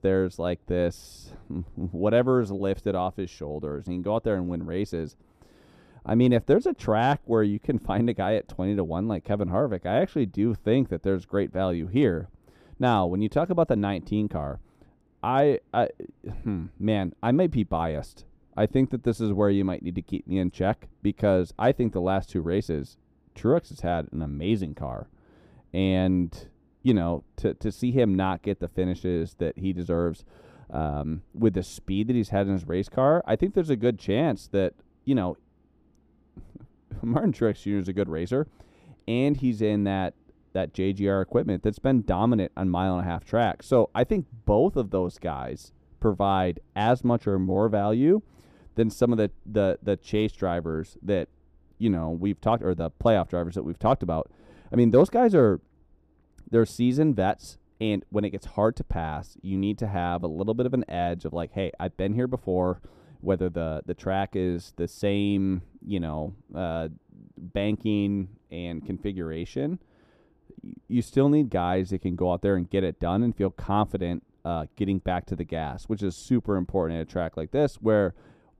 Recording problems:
muffled; slightly; fading above 1 kHz

